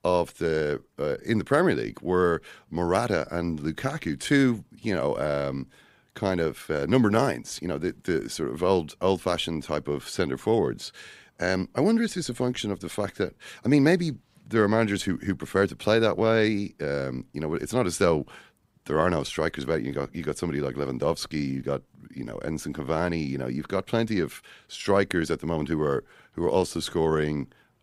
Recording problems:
none

